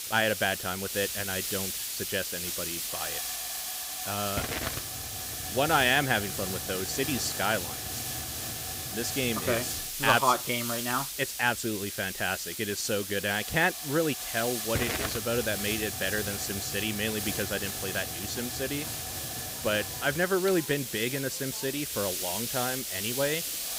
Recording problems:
hiss; loud; throughout; 2 dB below the speech
crowd noise; faint; throughout; 25 dB below the speech

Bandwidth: 15.5 kHz